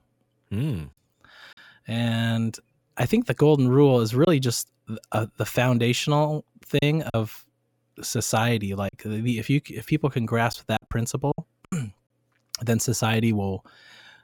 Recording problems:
choppy; occasionally; 4% of the speech affected

